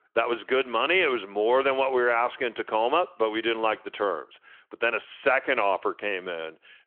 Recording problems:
phone-call audio

